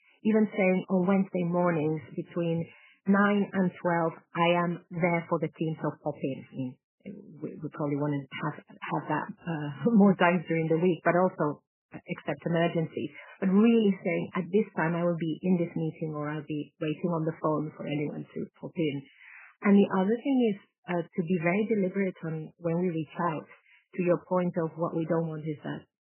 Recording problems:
garbled, watery; badly; nothing above 3 kHz

